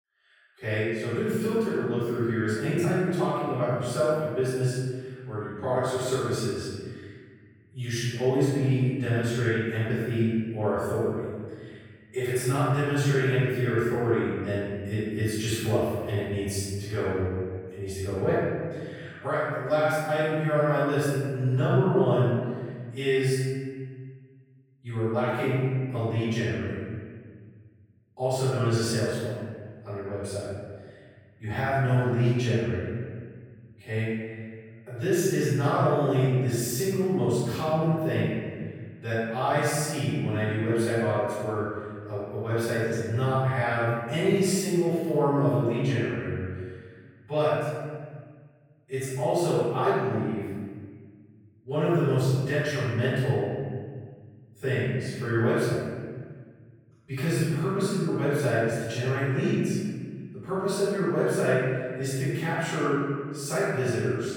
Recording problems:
room echo; strong; dies away in 1.9 s
off-mic speech; far

